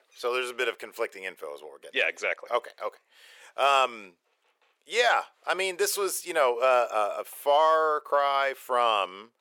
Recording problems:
thin; very; fading below 450 Hz

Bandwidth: 17.5 kHz